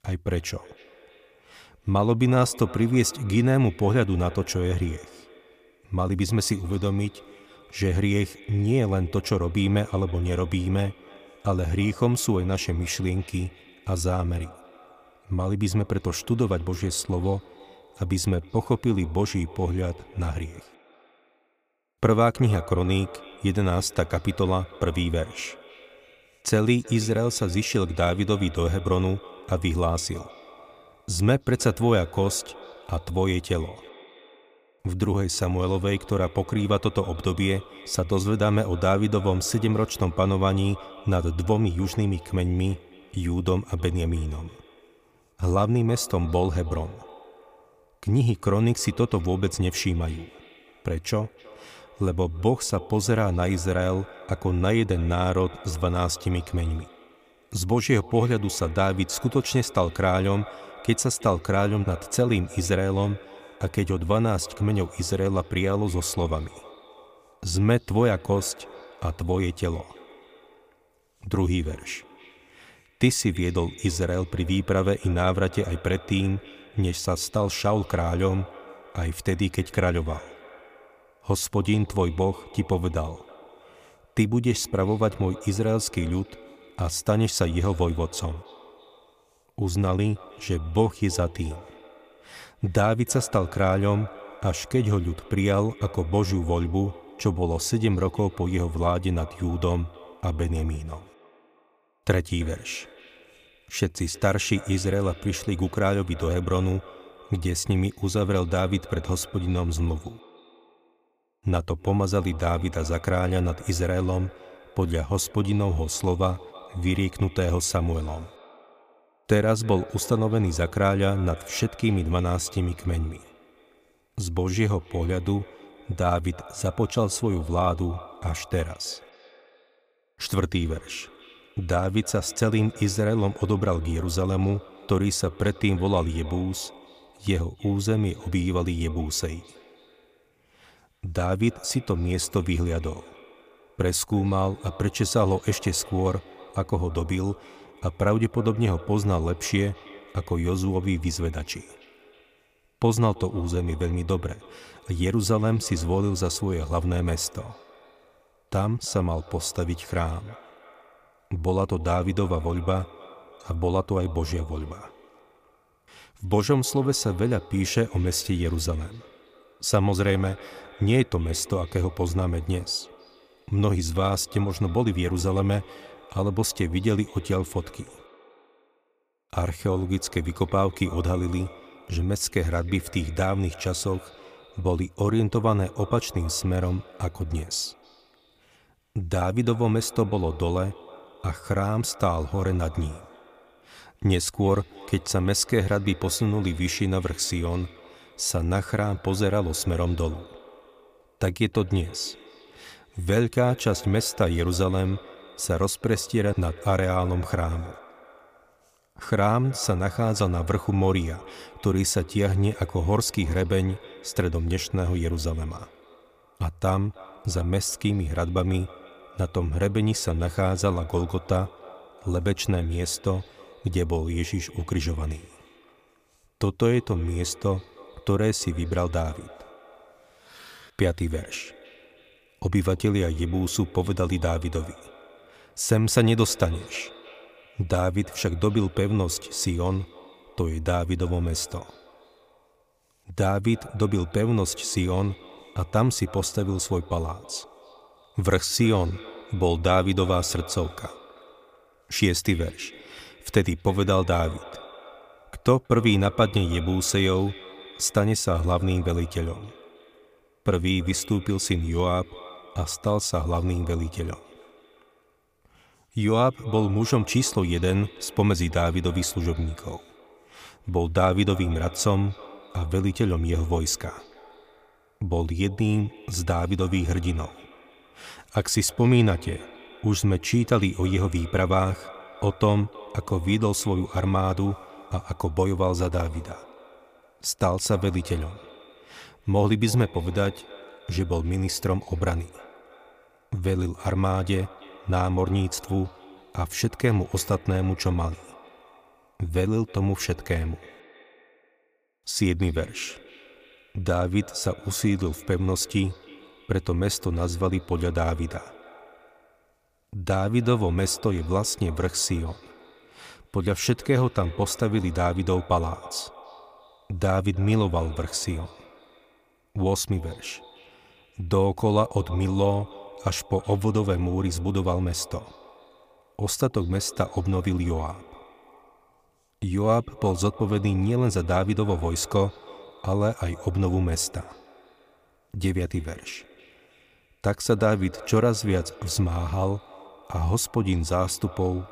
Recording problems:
echo of what is said; faint; throughout; 320 ms later, 20 dB below the speech

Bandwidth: 15 kHz